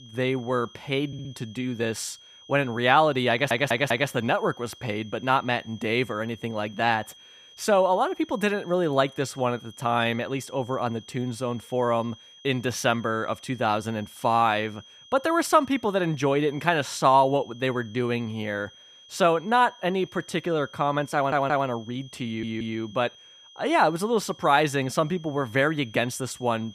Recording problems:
high-pitched whine; faint; throughout; 3.5 kHz, 25 dB below the speech
audio stuttering; 4 times, first at 1 s

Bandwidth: 14.5 kHz